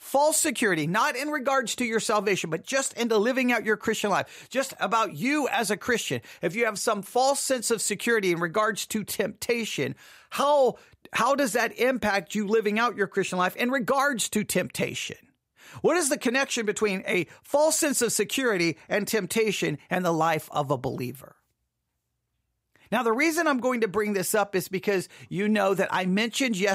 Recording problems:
abrupt cut into speech; at the end

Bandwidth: 15.5 kHz